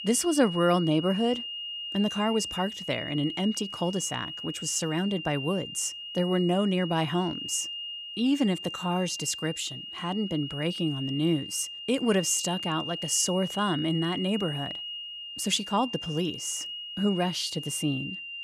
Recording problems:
high-pitched whine; loud; throughout; 3 kHz, 7 dB below the speech

